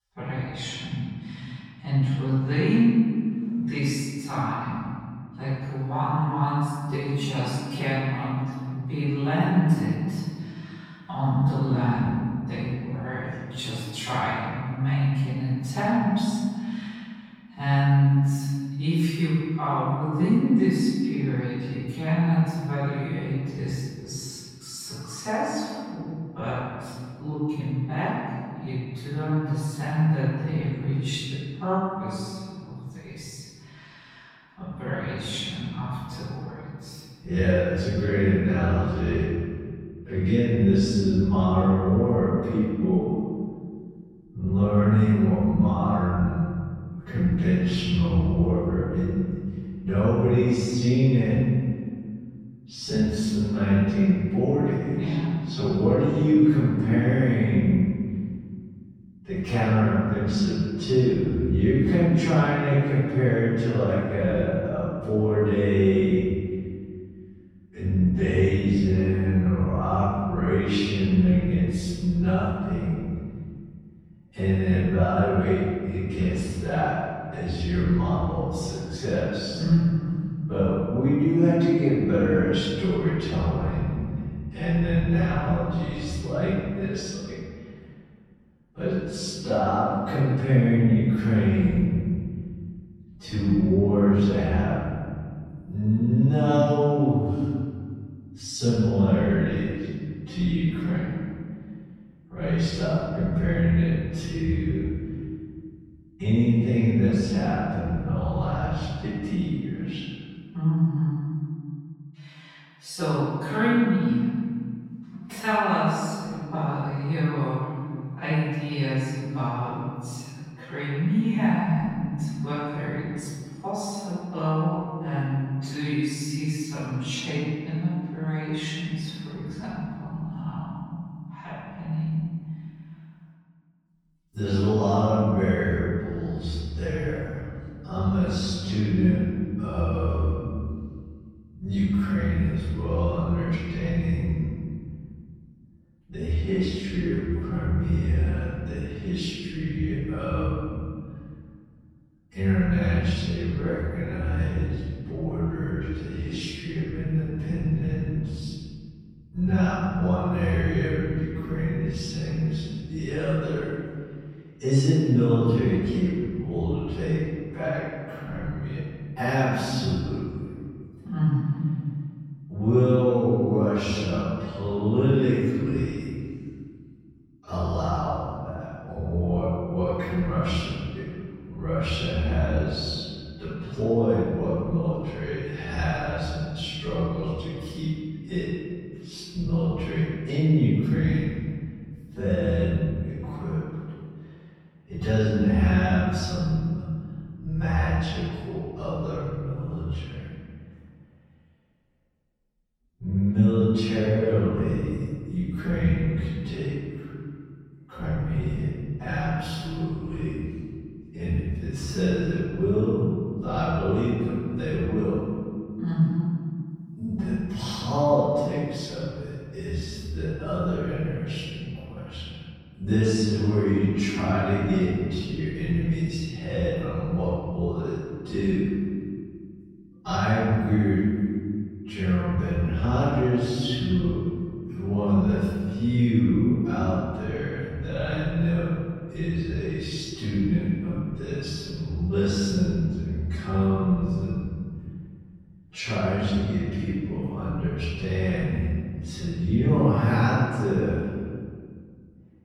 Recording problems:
room echo; strong; dies away in 2.2 s
off-mic speech; far
wrong speed, natural pitch; too slow; 0.5 times normal speed

